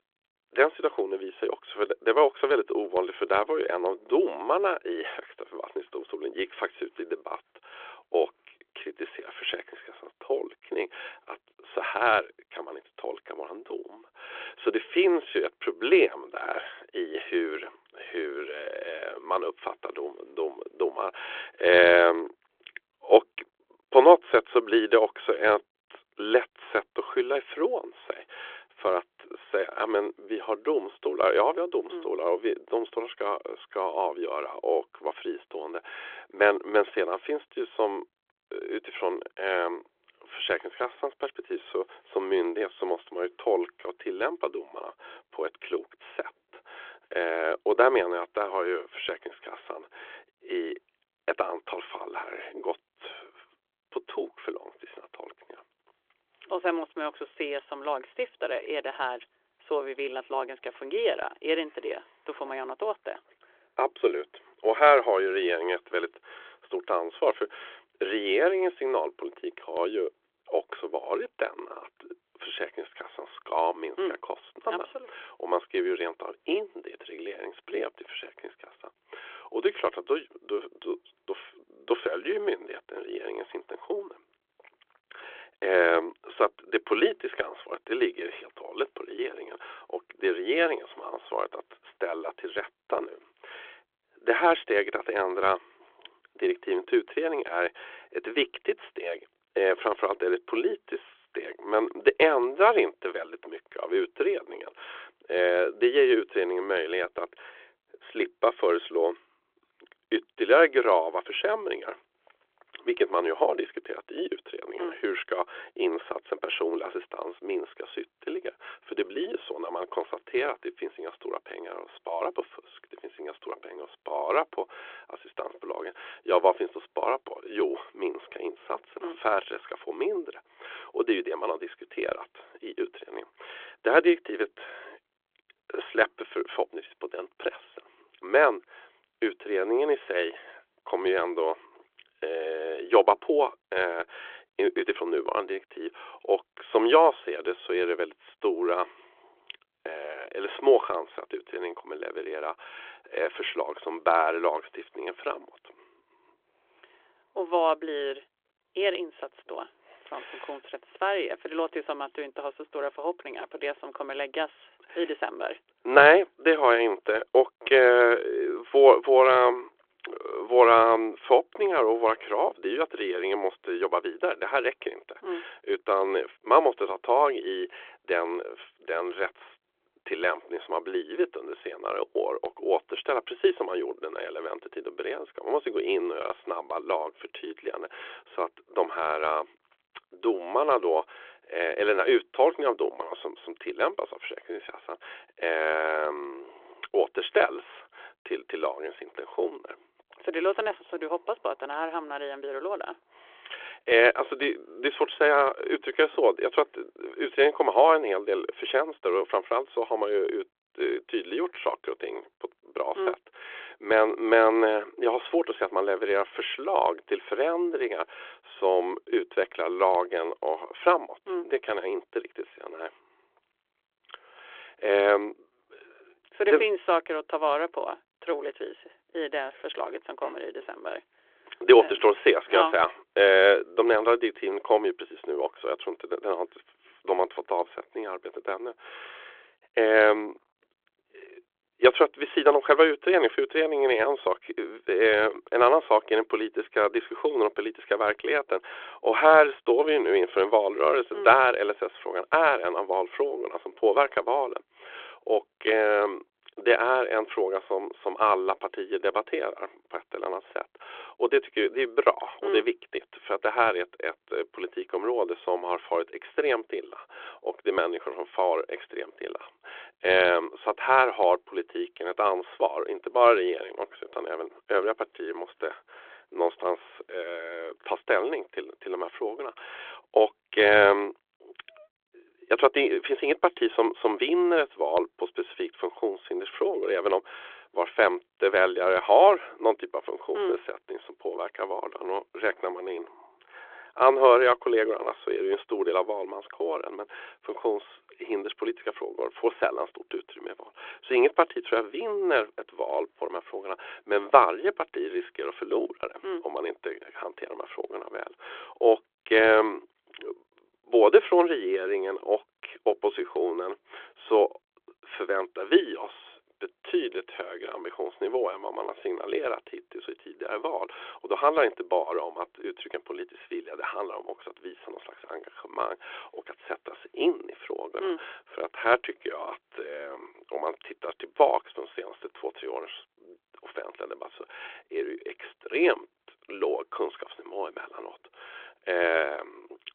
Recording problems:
phone-call audio; nothing above 3.5 kHz

